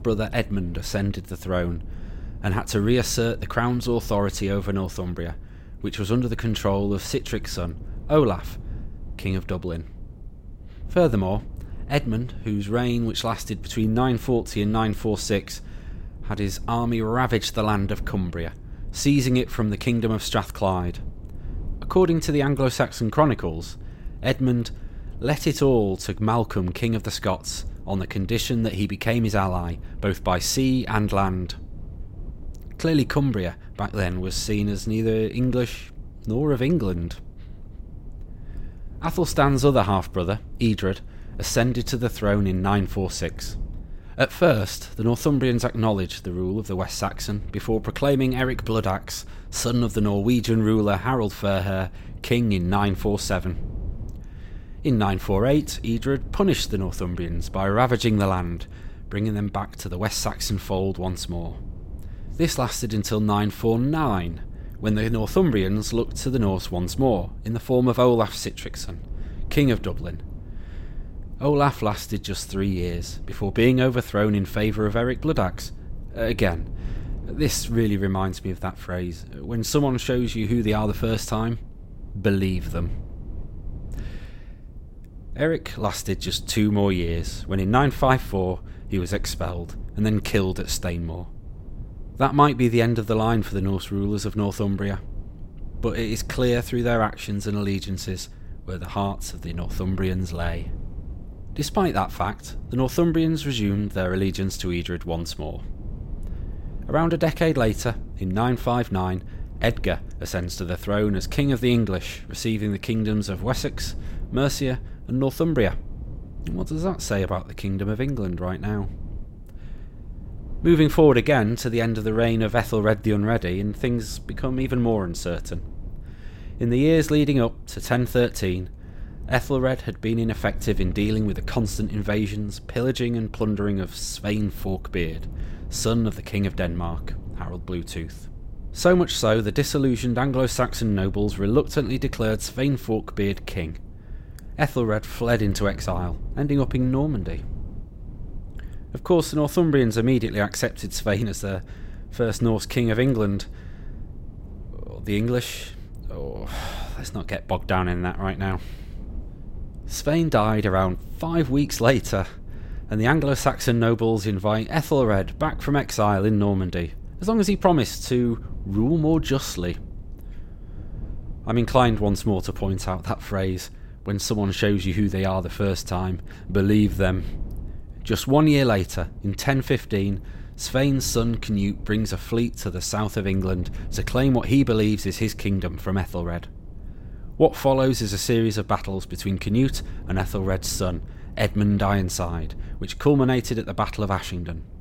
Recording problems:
low rumble; faint; throughout; 25 dB below the speech

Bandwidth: 16 kHz